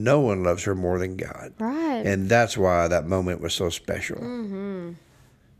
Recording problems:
abrupt cut into speech; at the start

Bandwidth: 14.5 kHz